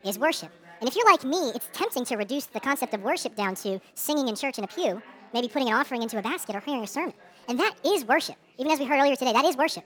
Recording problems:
wrong speed and pitch; too fast and too high; 1.5 times normal speed
chatter from many people; faint; throughout; 25 dB below the speech

